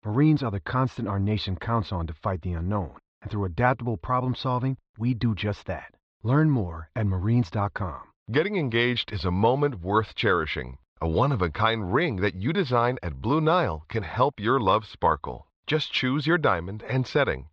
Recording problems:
muffled; slightly; fading above 4 kHz

